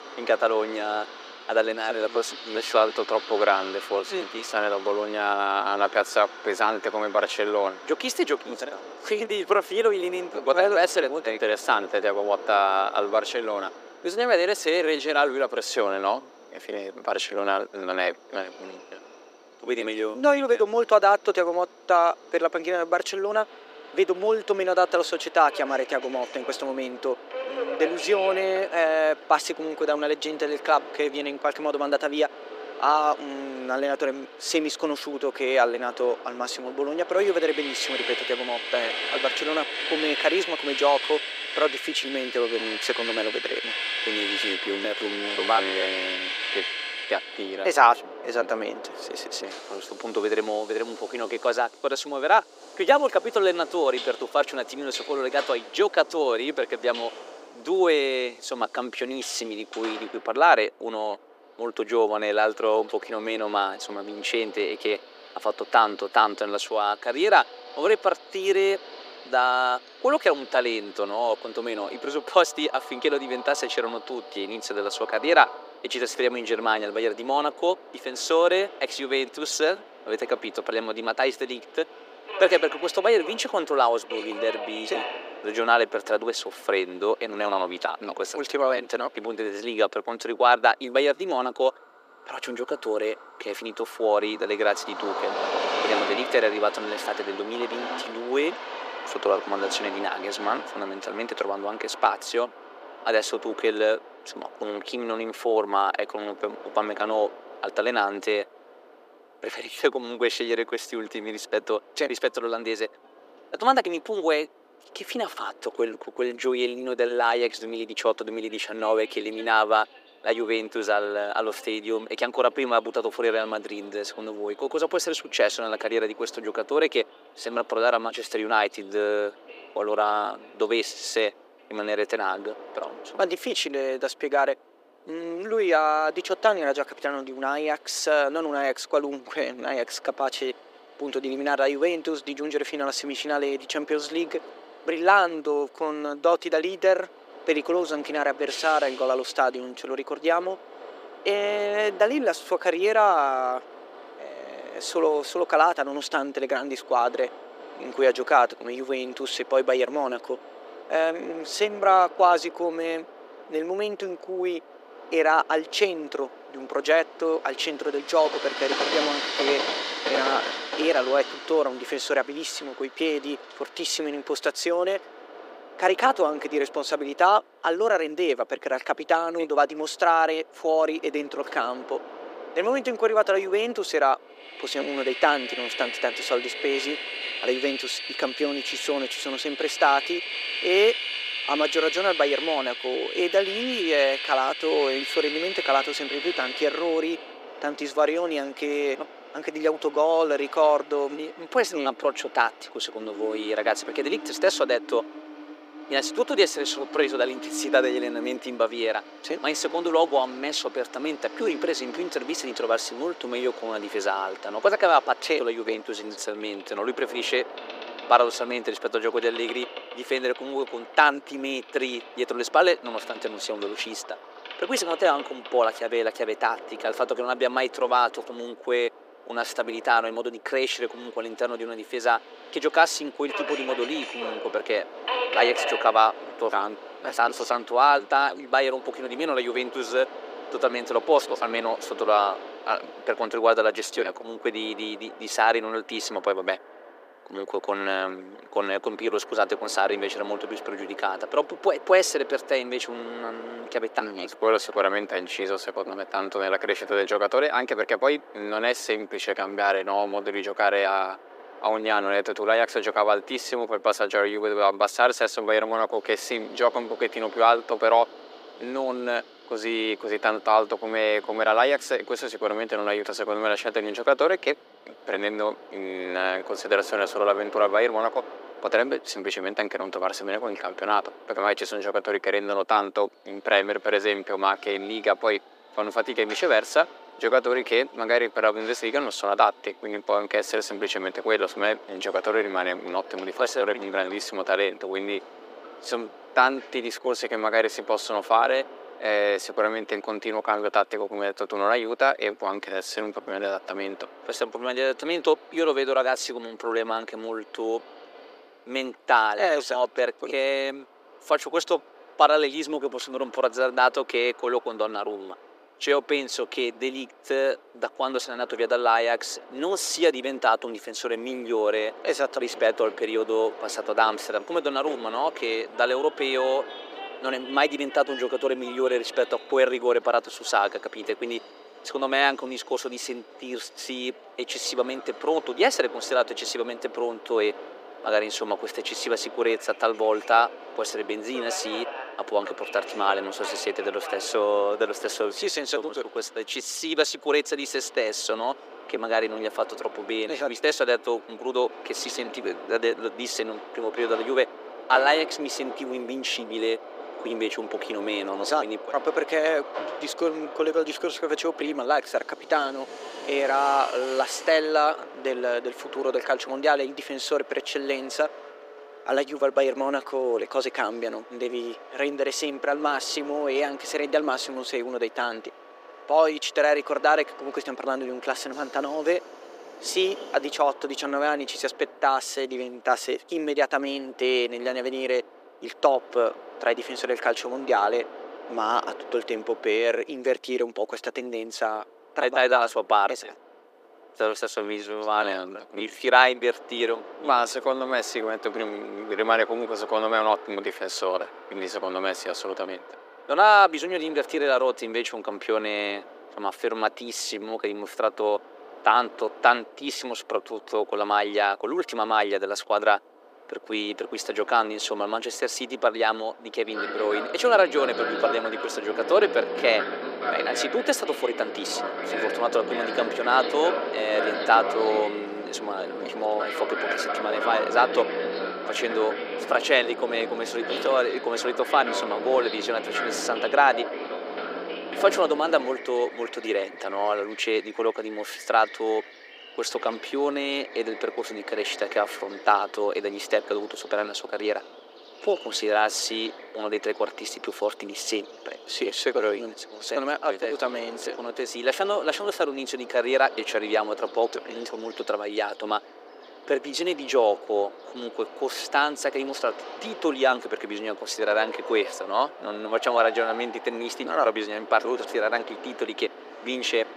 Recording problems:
thin; very; fading below 350 Hz
train or aircraft noise; noticeable; throughout; 10 dB below the speech

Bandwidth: 15 kHz